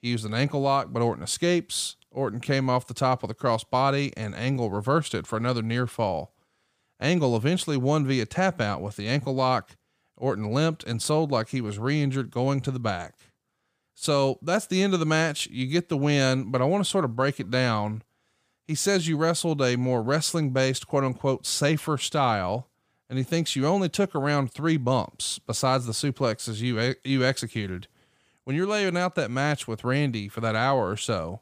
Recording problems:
none

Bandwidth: 15 kHz